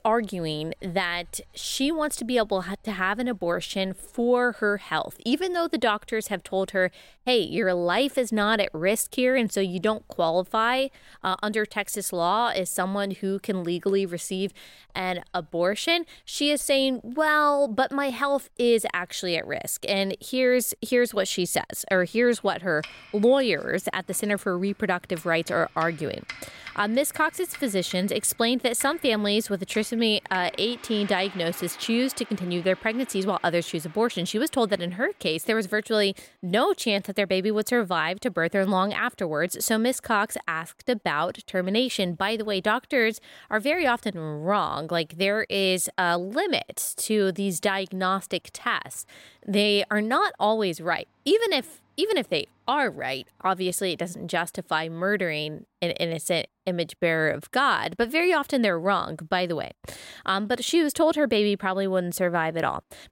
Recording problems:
household noises; faint; throughout; 20 dB below the speech

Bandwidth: 16 kHz